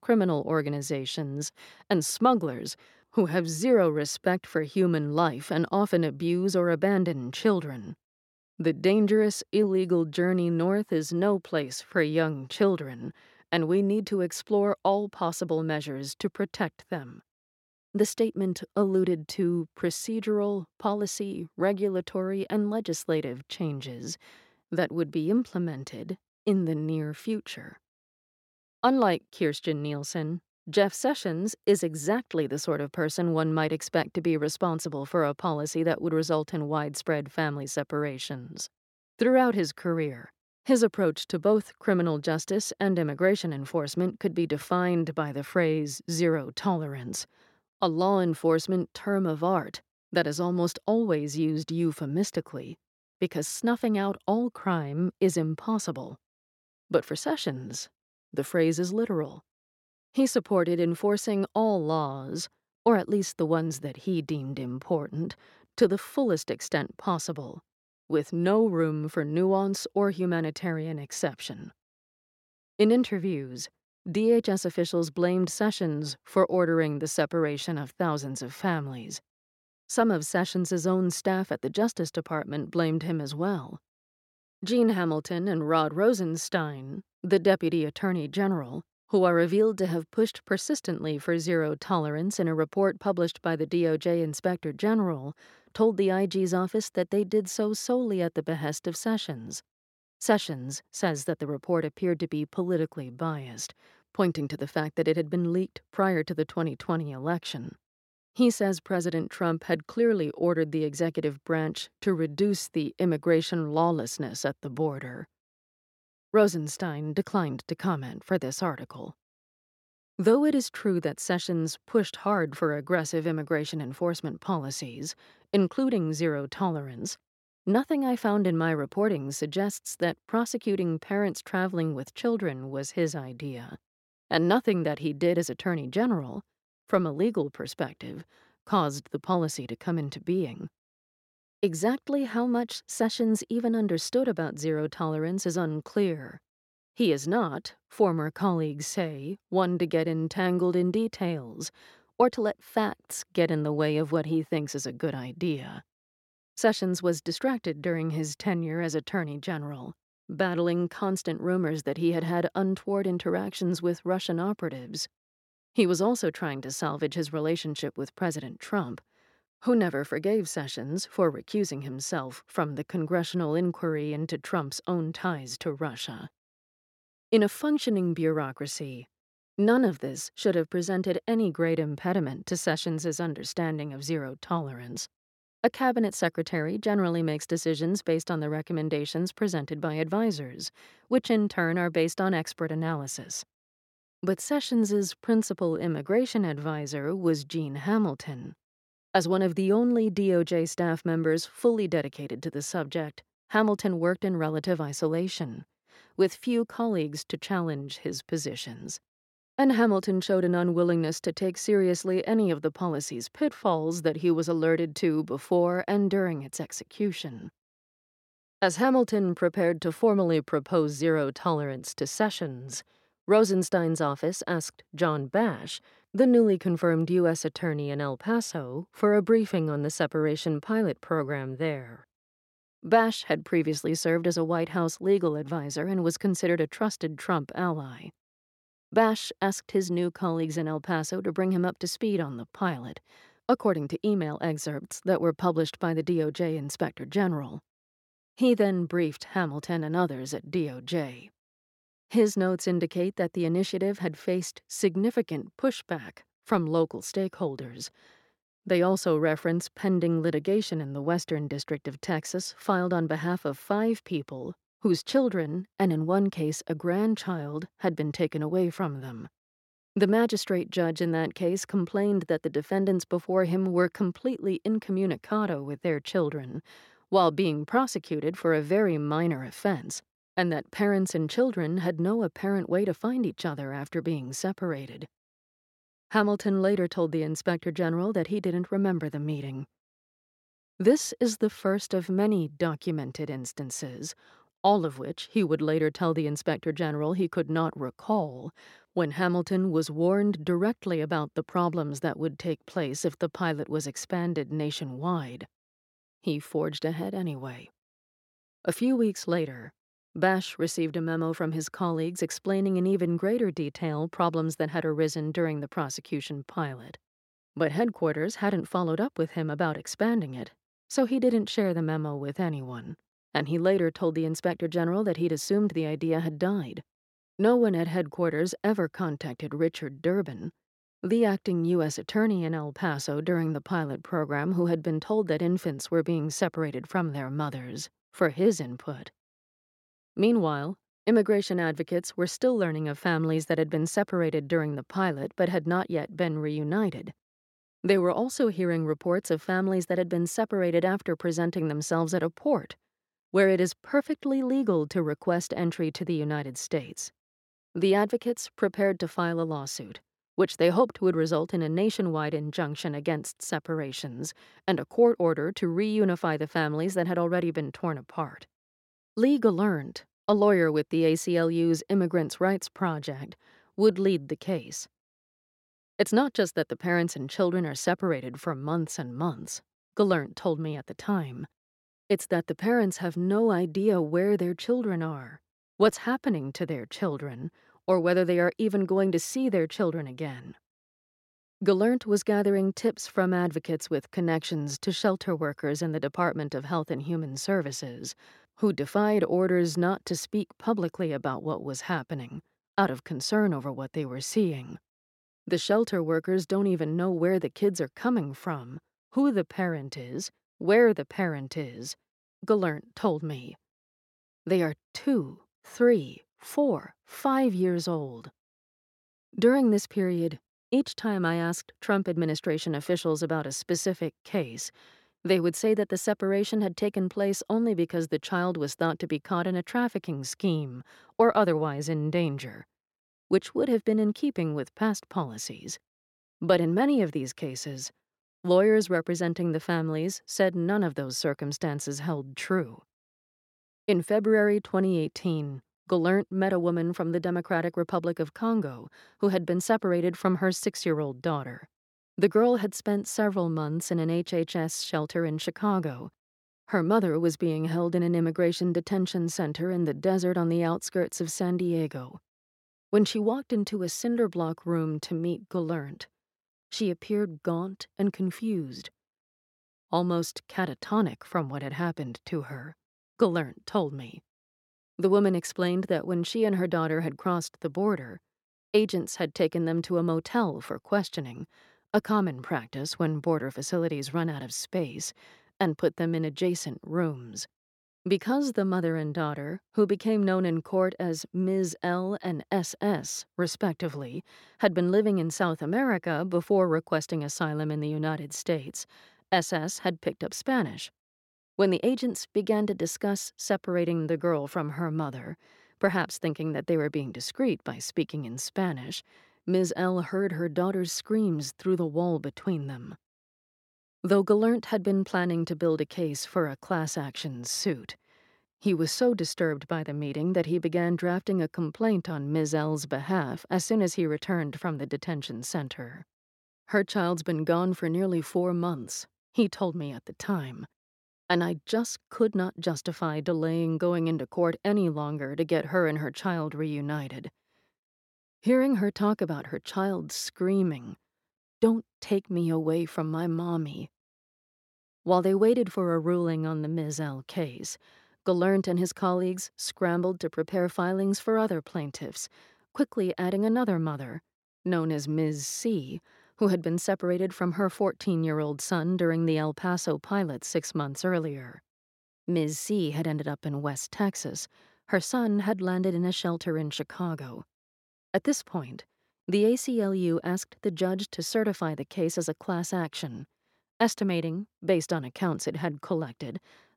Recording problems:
none

